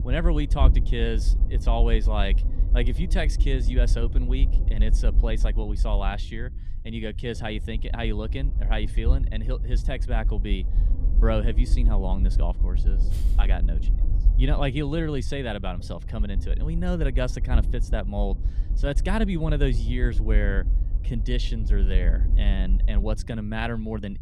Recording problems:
low rumble; noticeable; throughout; 15 dB below the speech

